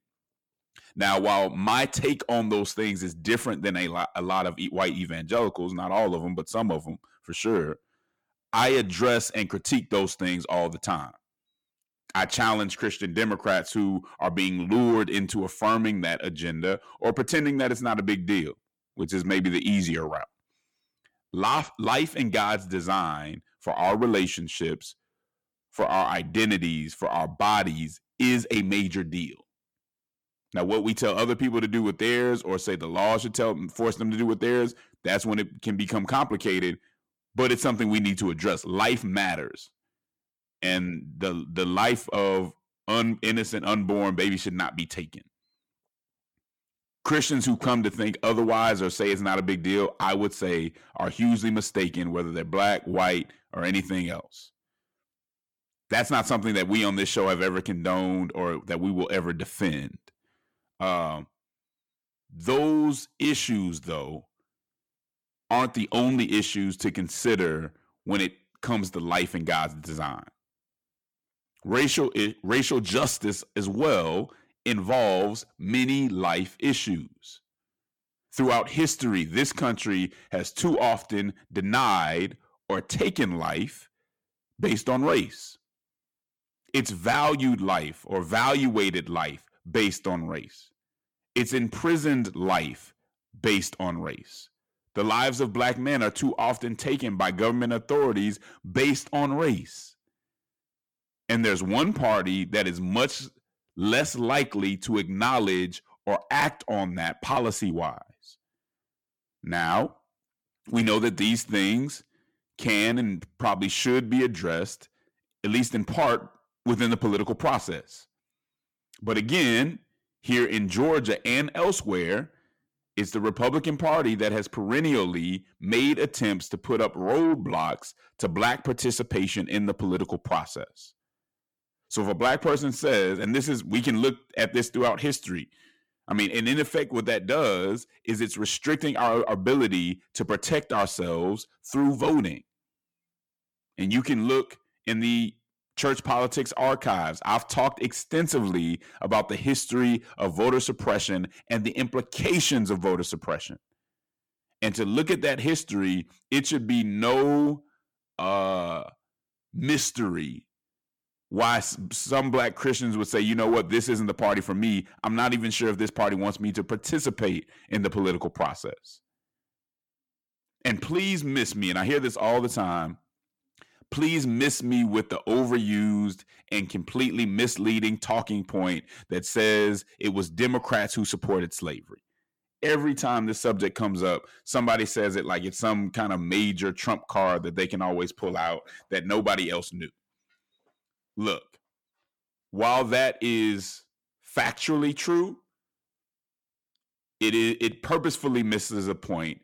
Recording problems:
distortion; slight; 10 dB below the speech

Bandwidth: 18 kHz